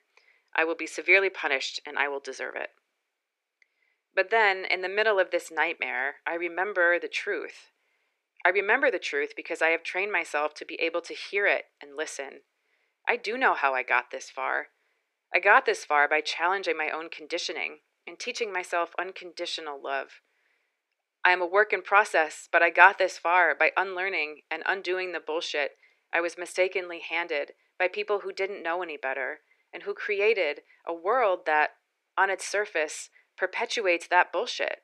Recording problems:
thin; very; fading below 400 Hz

